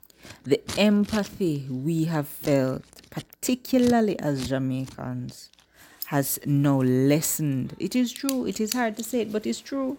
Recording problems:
household noises; noticeable; throughout; 15 dB below the speech

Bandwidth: 16.5 kHz